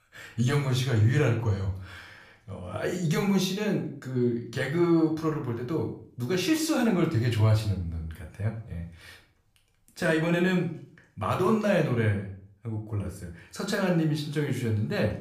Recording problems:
room echo; slight; dies away in 0.4 s
off-mic speech; somewhat distant

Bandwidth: 15 kHz